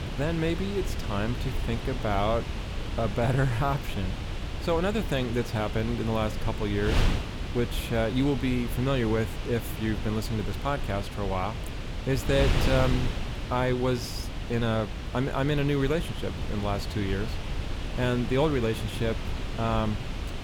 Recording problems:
wind noise on the microphone; heavy; 7 dB below the speech

